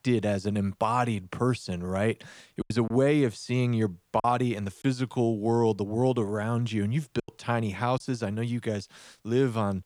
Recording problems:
choppy; very; from 2.5 to 5 s and at 7 s; 7% of the speech affected

